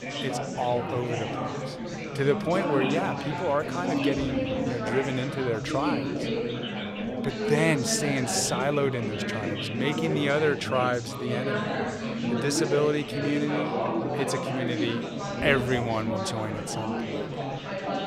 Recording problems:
chatter from many people; loud; throughout; 2 dB below the speech

